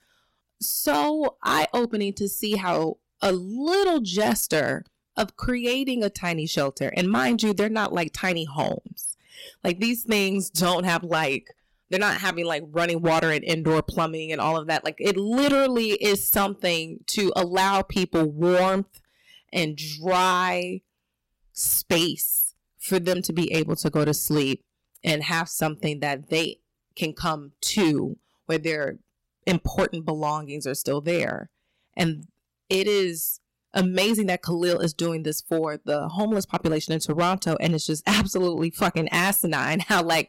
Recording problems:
distortion; heavy; 7% of the sound clipped

